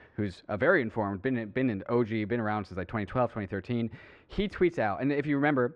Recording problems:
muffled; very; fading above 2 kHz

